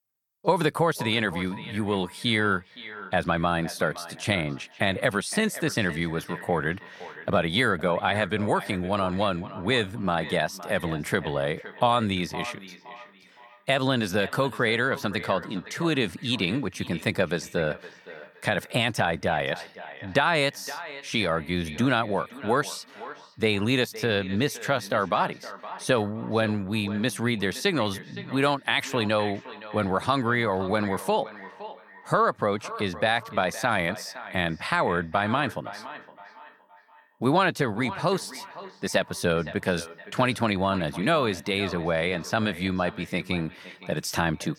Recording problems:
echo of what is said; noticeable; throughout; 520 ms later, 15 dB below the speech

